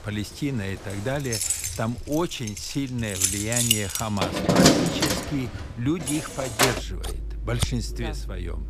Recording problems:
household noises; very loud; throughout; 5 dB above the speech

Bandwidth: 15 kHz